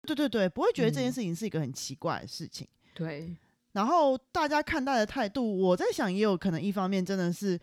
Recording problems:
none

